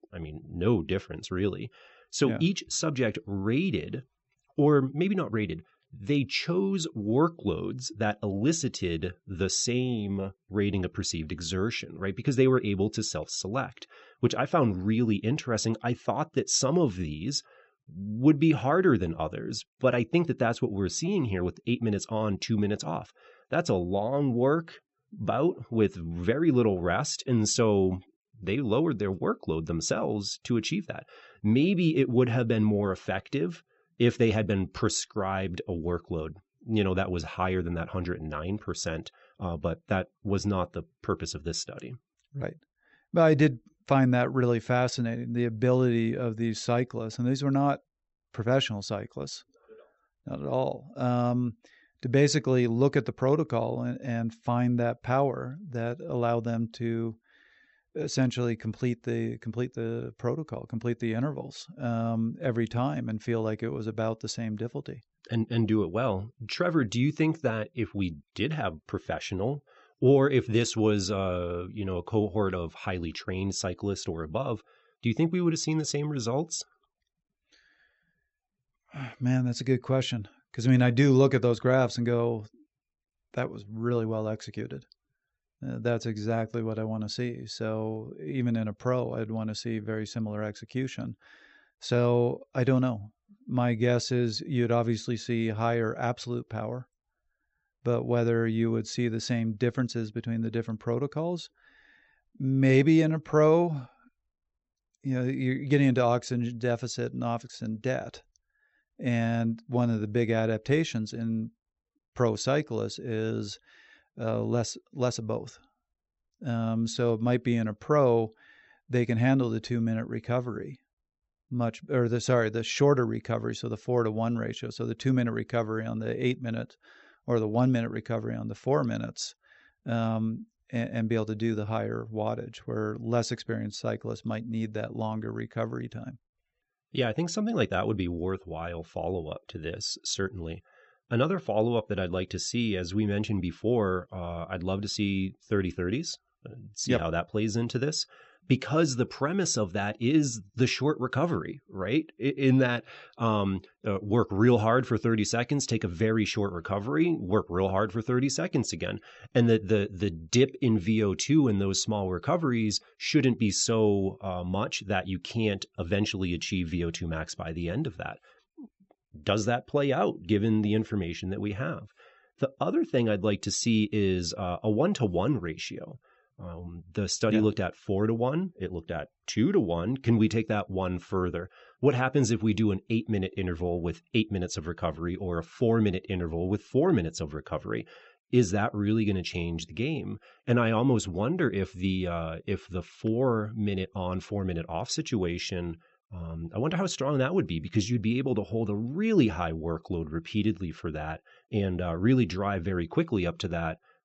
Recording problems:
high frequencies cut off; noticeable; nothing above 8 kHz

